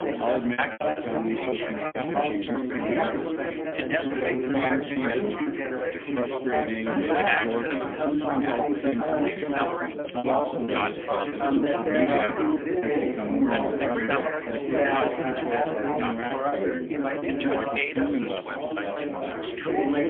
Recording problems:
phone-call audio; poor line; nothing above 3.5 kHz
chatter from many people; very loud; throughout; 4 dB above the speech
choppy; very; 15% of the speech affected

